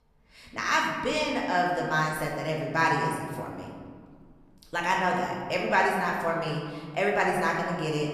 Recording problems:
room echo; noticeable; dies away in 1.6 s
off-mic speech; somewhat distant

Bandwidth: 14.5 kHz